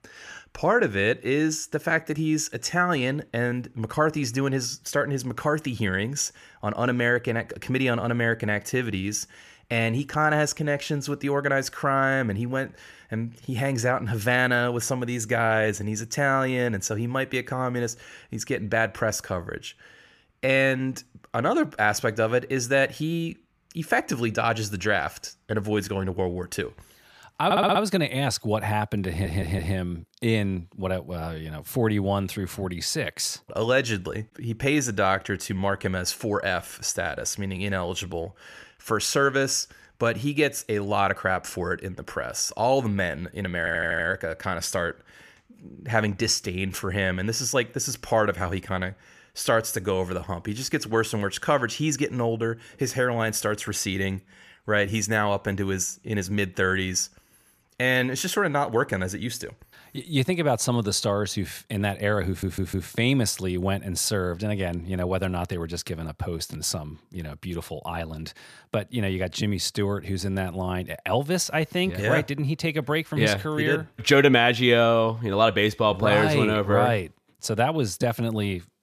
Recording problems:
audio stuttering; 4 times, first at 27 s

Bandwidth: 14.5 kHz